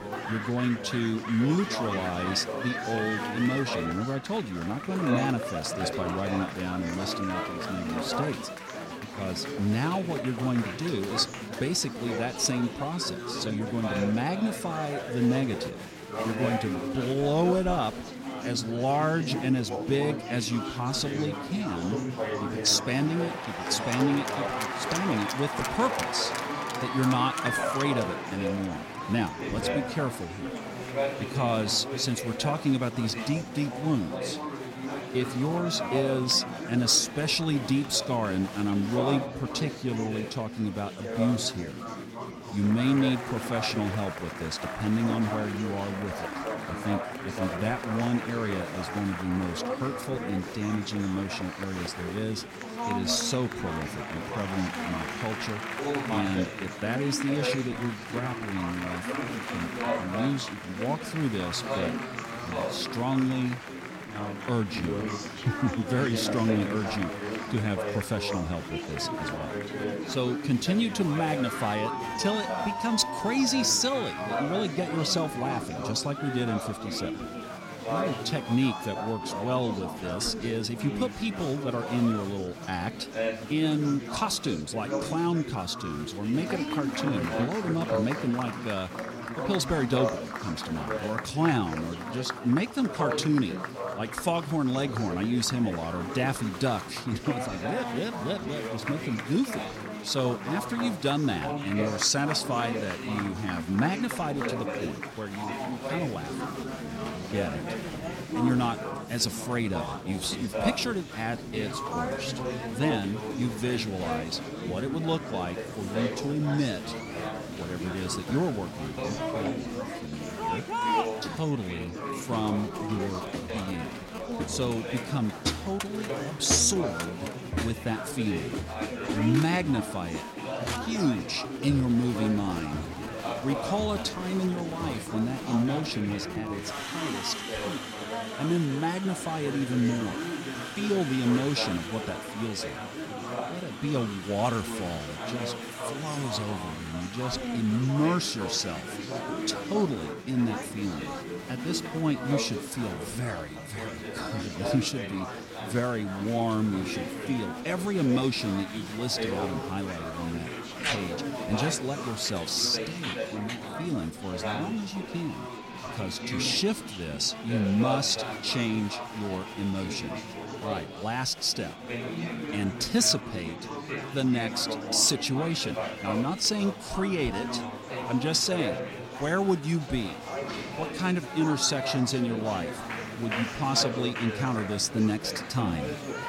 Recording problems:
chatter from many people; loud; throughout; 5 dB below the speech

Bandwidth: 16.5 kHz